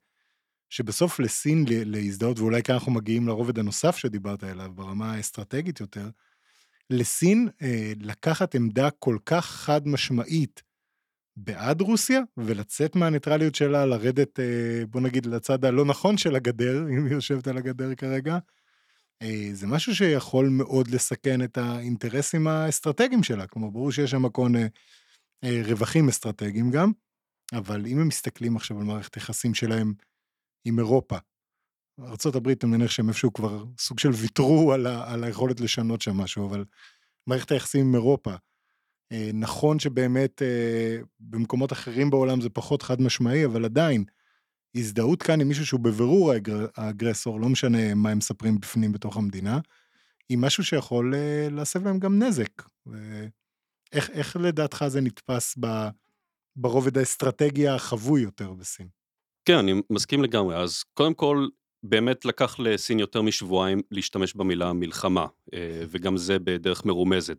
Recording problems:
none

